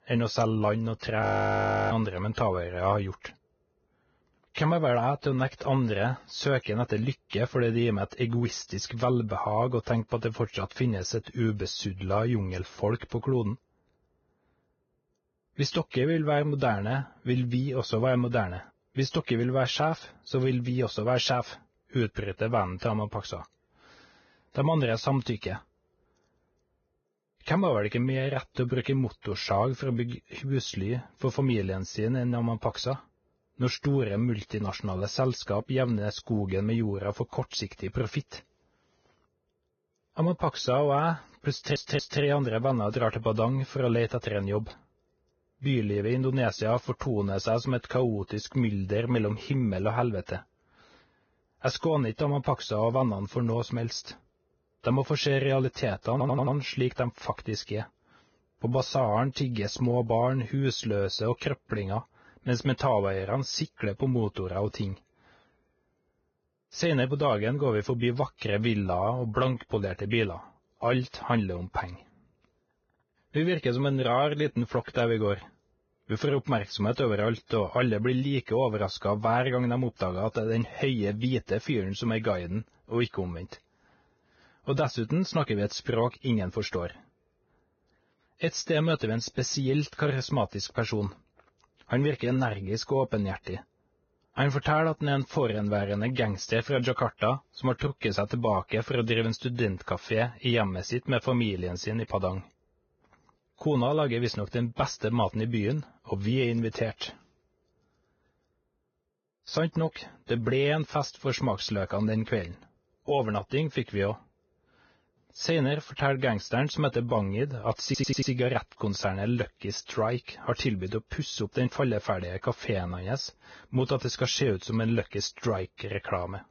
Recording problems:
garbled, watery; badly; nothing above 6.5 kHz
audio freezing; at 1 s for 0.5 s
audio stuttering; at 42 s, at 56 s and at 1:58

